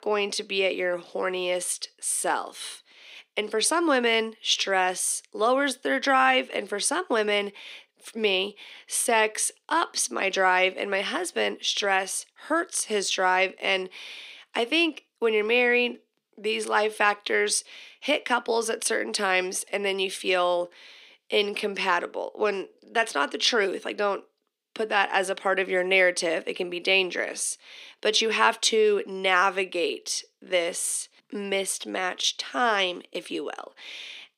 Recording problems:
thin; somewhat; fading below 300 Hz

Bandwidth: 15.5 kHz